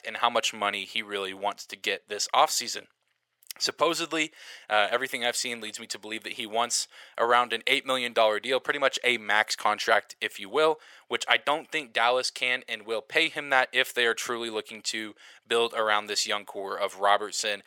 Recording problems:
thin; very; fading below 700 Hz

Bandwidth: 17 kHz